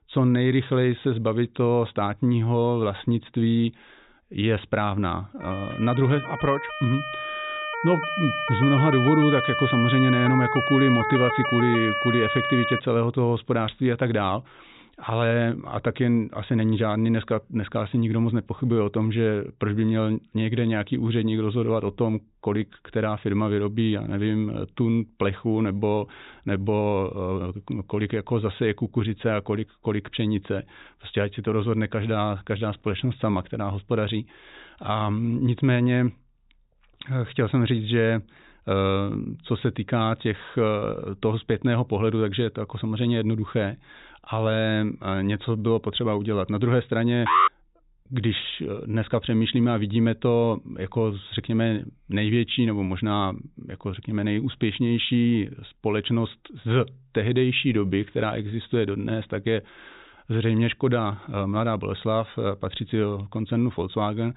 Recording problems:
high frequencies cut off; severe; nothing above 4 kHz
siren; loud; from 5.5 to 13 s; peak level with the speech
alarm; loud; at 47 s; peak 5 dB above the speech

